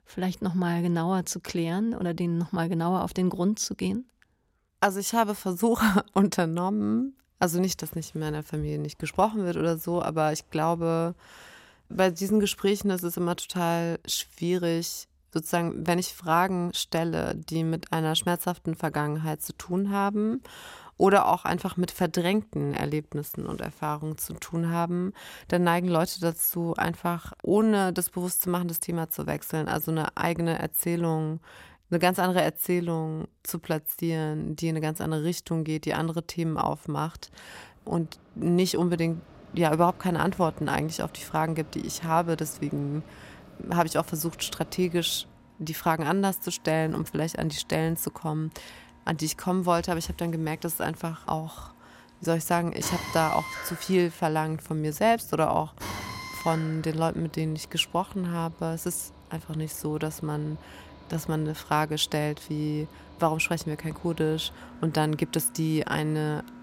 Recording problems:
machinery noise; noticeable; from 36 s on; 20 dB below the speech

